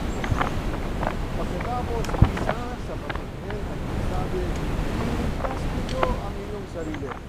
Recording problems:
wind noise on the microphone; heavy; 4 dB above the speech

